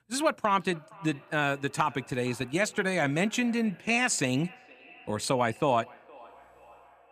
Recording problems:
echo of what is said; faint; throughout; 470 ms later, 25 dB below the speech

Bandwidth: 14.5 kHz